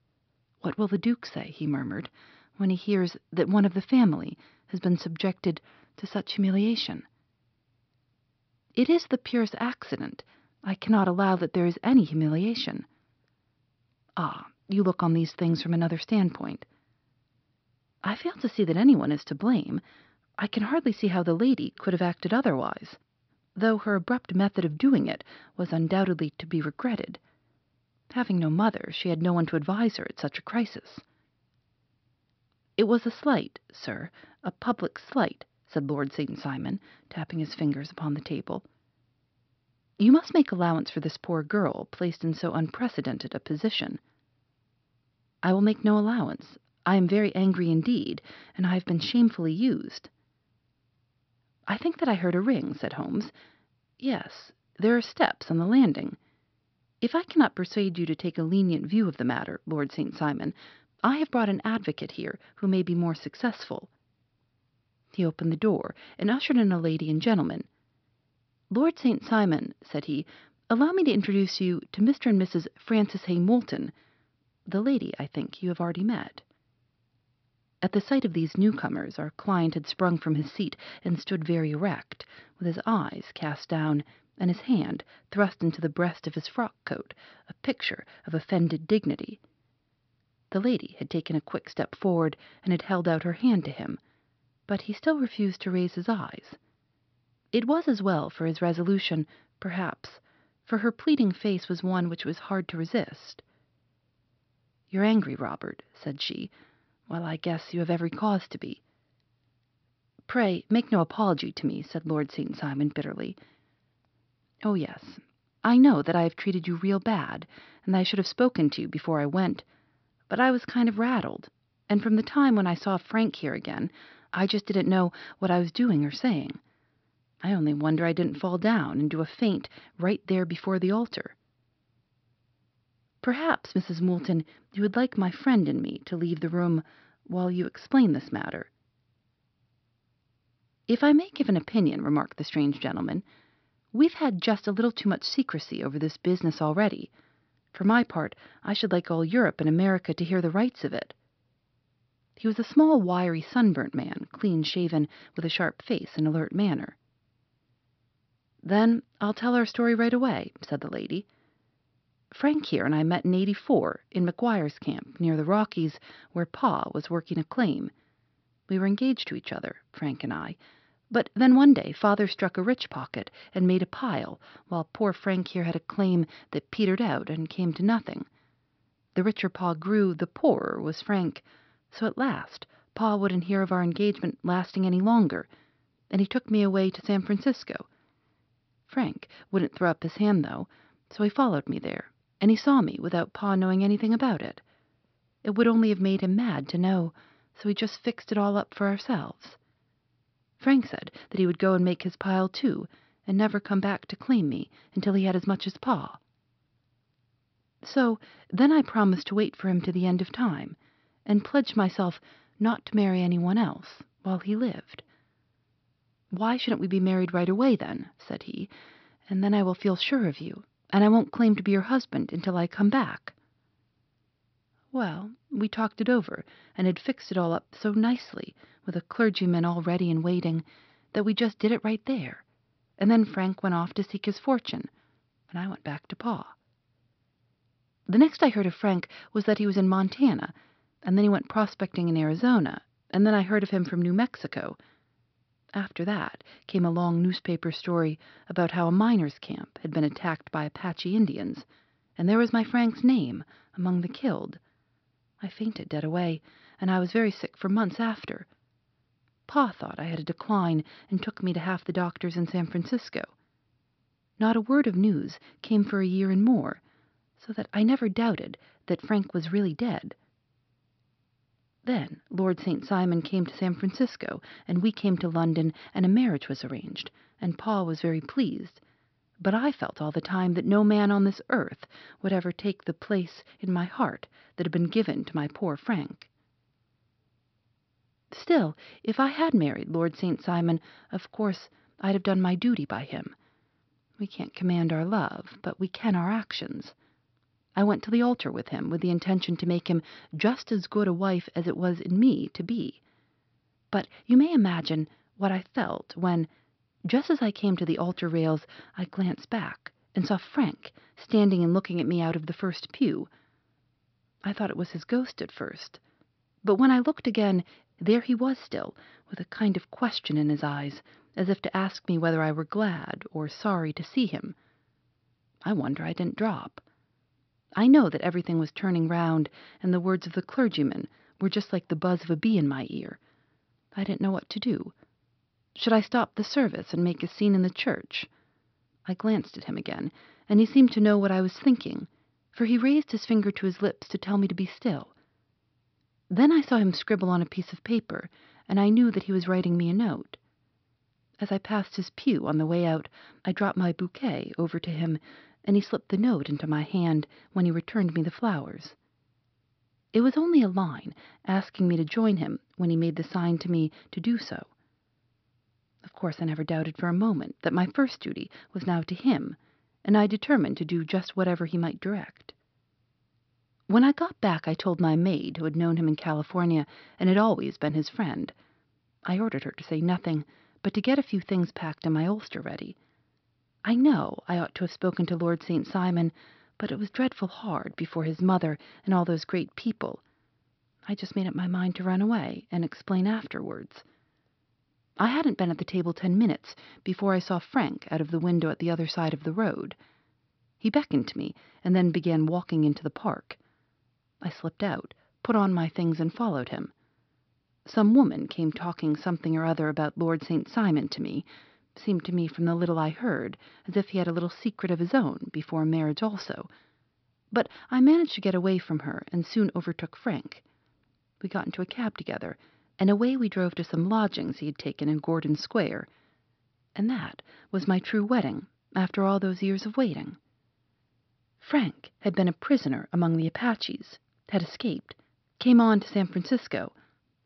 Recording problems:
high frequencies cut off; noticeable; nothing above 5.5 kHz

